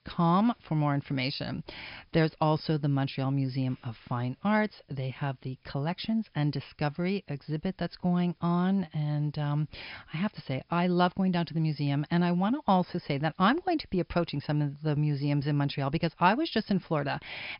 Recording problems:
high frequencies cut off; noticeable; nothing above 5.5 kHz
hiss; very faint; throughout; 45 dB below the speech

